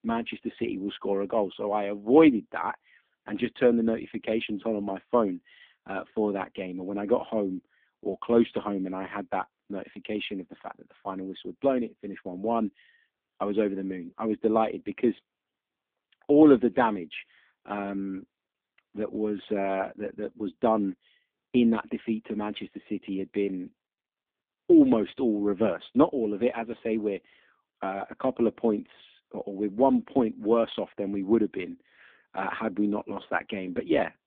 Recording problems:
phone-call audio; poor line

